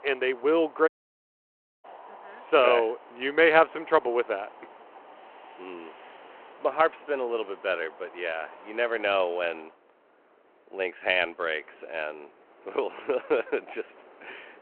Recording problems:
phone-call audio
wind in the background; faint; throughout; 25 dB below the speech
audio cutting out; at 1 s for 1 s

